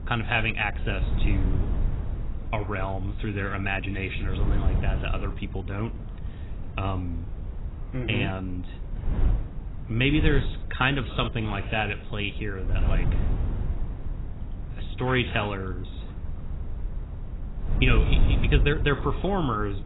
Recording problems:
garbled, watery; badly; nothing above 4 kHz
wind noise on the microphone; occasional gusts; 15 dB below the speech

